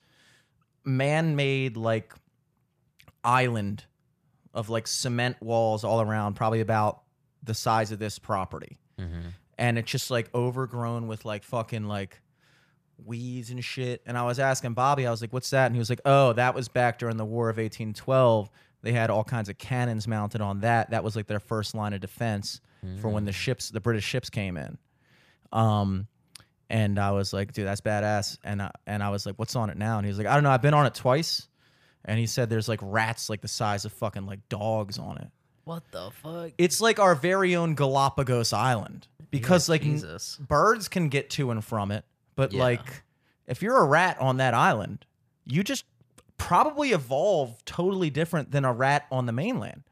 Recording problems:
none

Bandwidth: 14.5 kHz